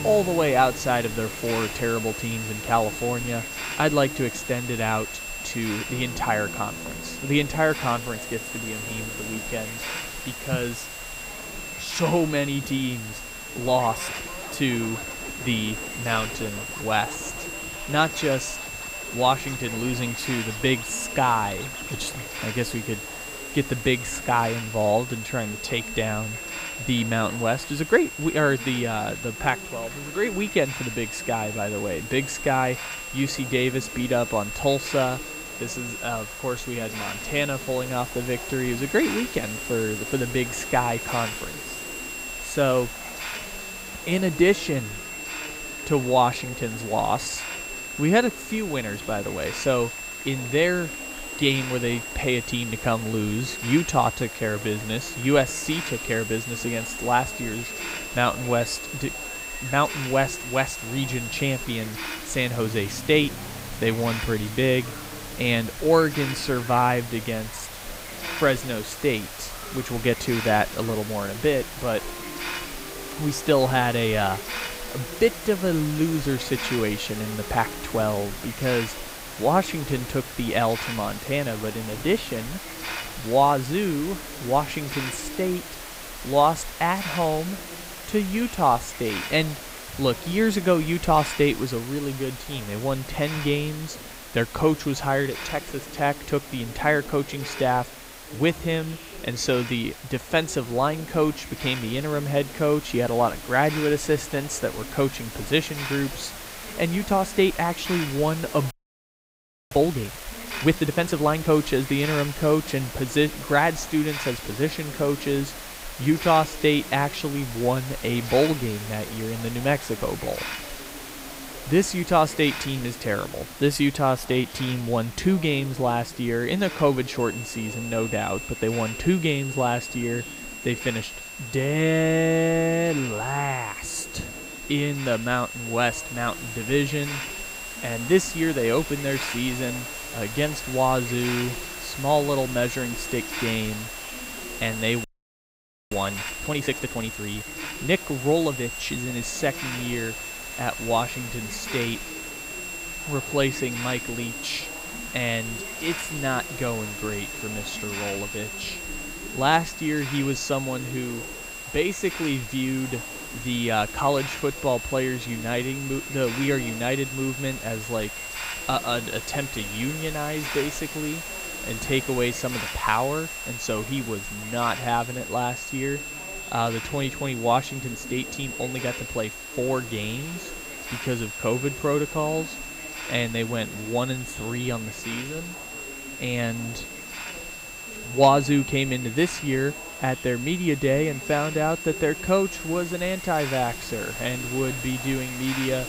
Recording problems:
high-pitched whine; loud; until 1:02 and from 2:07 on; 2.5 kHz, 9 dB below the speech
chatter from many people; noticeable; throughout; 20 dB below the speech
hiss; noticeable; throughout; 10 dB below the speech
background music; faint; until 1:23; 20 dB below the speech
audio freezing; at 1:49 for 1 s and at 2:25 for 1 s

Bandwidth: 15.5 kHz